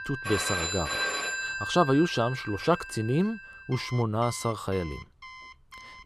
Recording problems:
alarms or sirens; loud; throughout; 5 dB below the speech

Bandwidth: 14.5 kHz